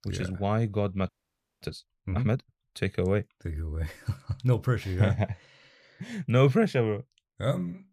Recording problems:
audio freezing; at 1 s for 0.5 s

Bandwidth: 15 kHz